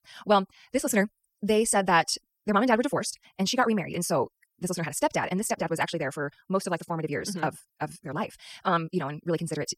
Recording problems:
wrong speed, natural pitch; too fast; 1.7 times normal speed

